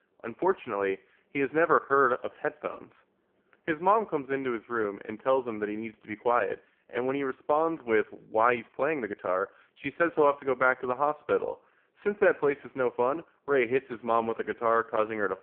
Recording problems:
phone-call audio; poor line

